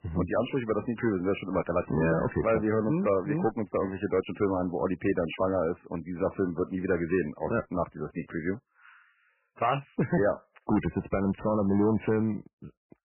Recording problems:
garbled, watery; badly; nothing above 3 kHz
distortion; slight; 3% of the sound clipped

